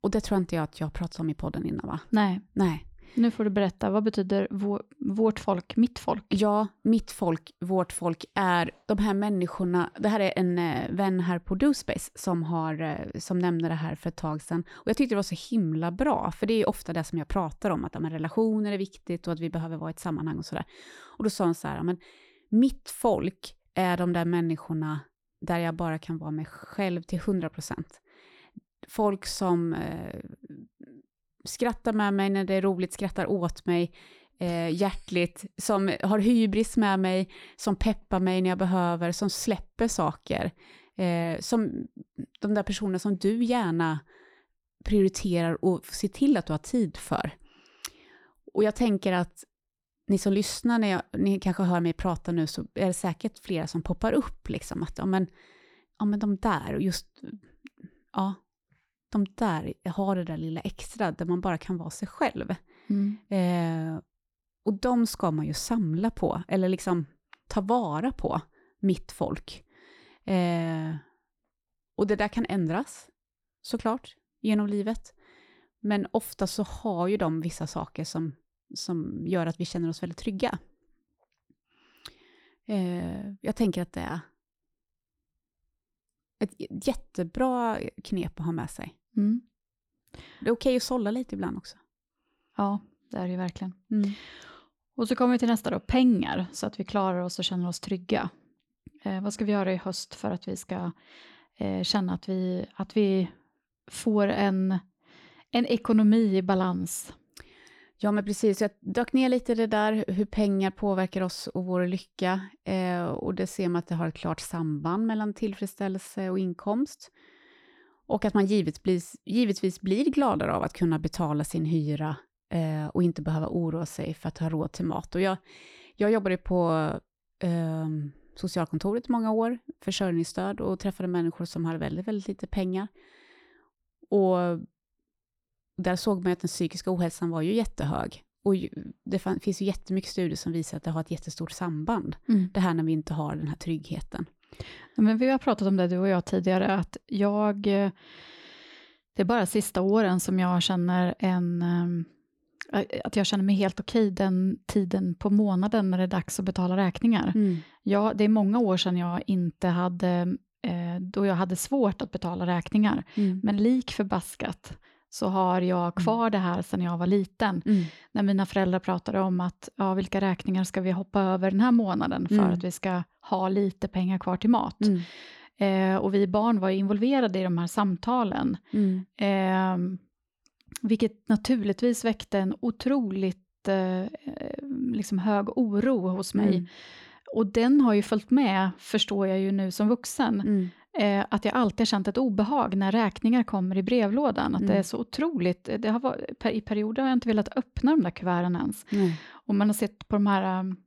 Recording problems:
none

